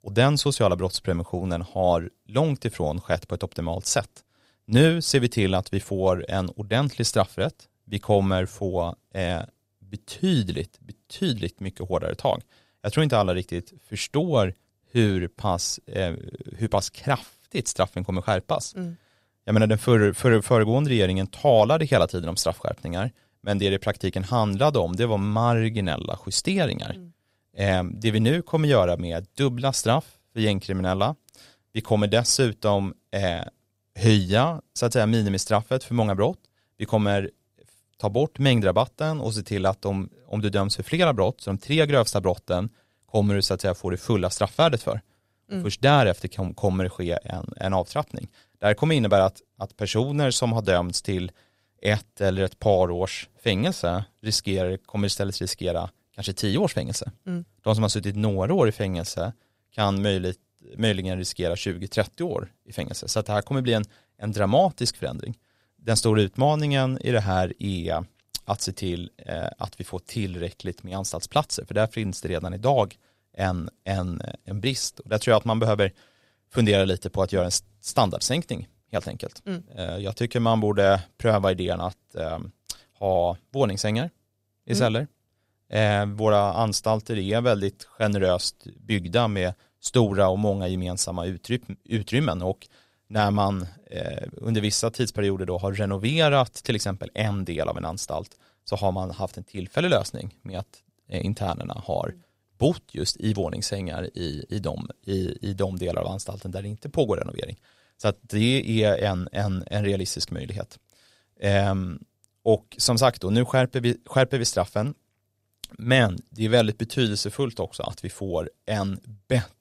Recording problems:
none

